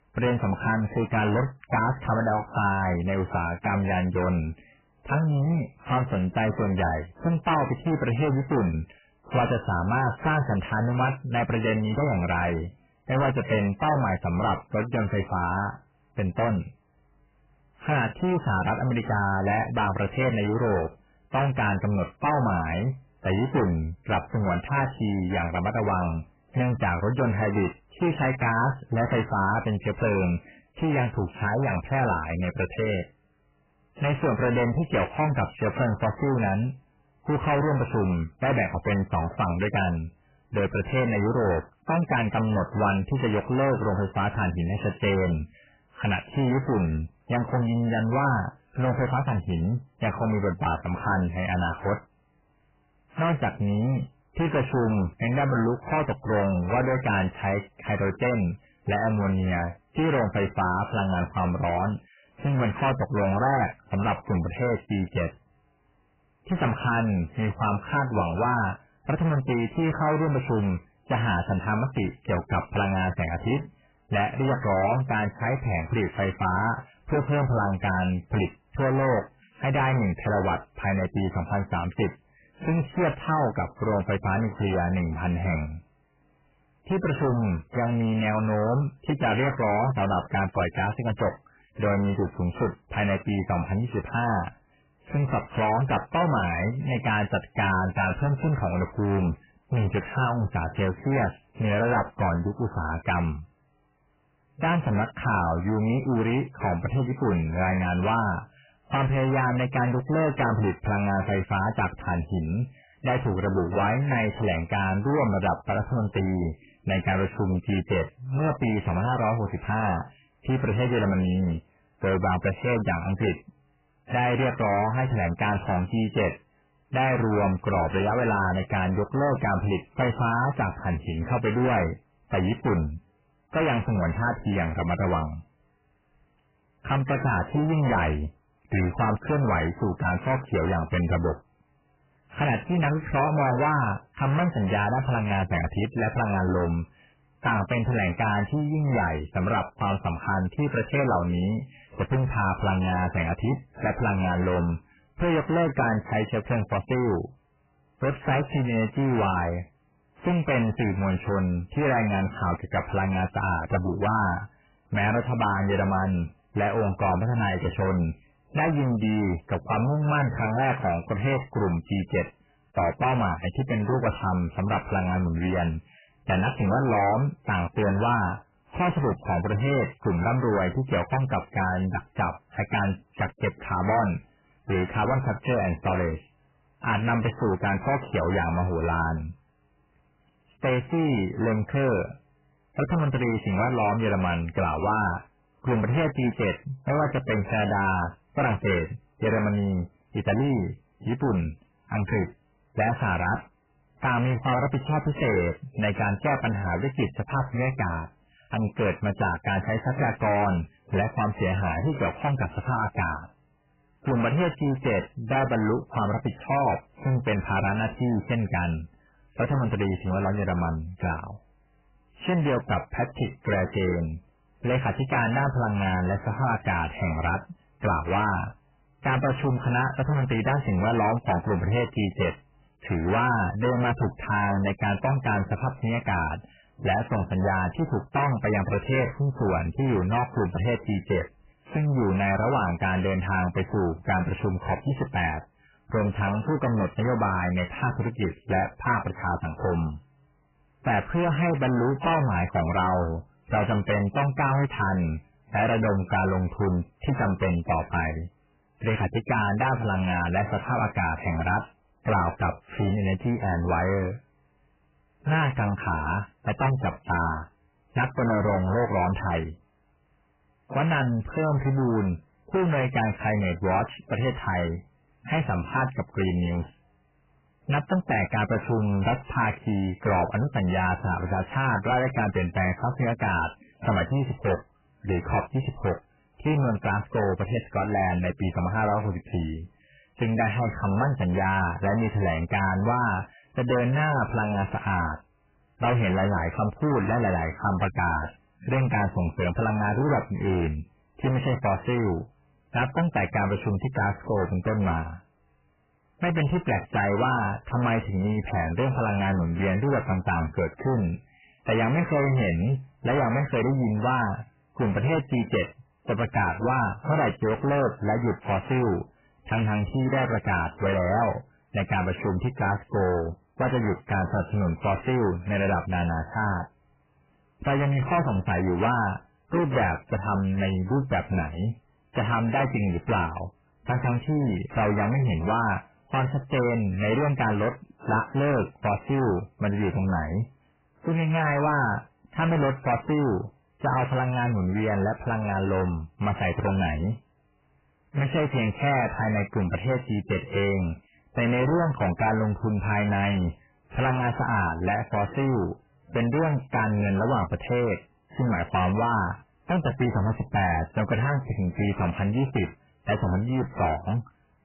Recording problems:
distortion; heavy; 6 dB below the speech
garbled, watery; badly; nothing above 3 kHz

